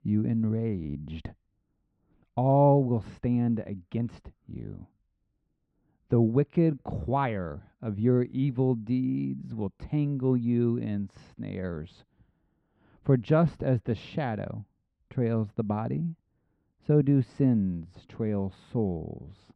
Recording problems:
muffled; very; fading above 2 kHz

